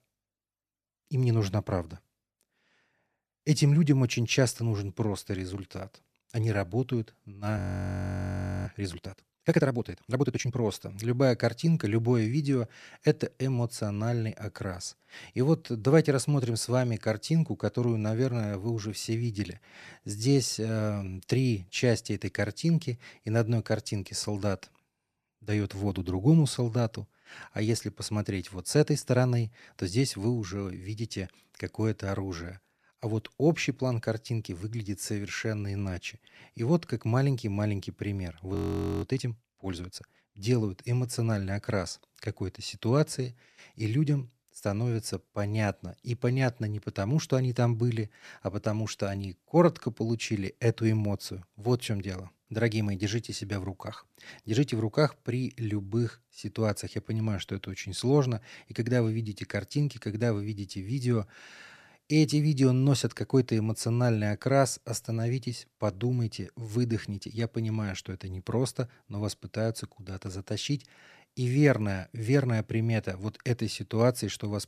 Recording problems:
audio freezing; at 7.5 s for 1 s and at 39 s

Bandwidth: 14 kHz